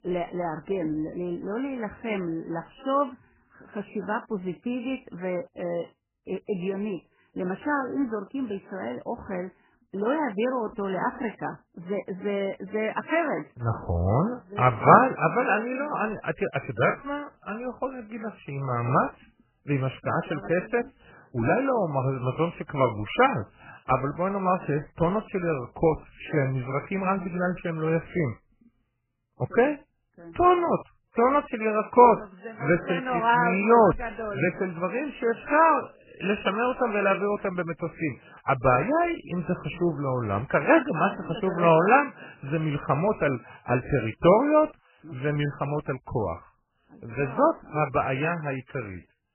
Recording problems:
garbled, watery; badly; nothing above 3 kHz

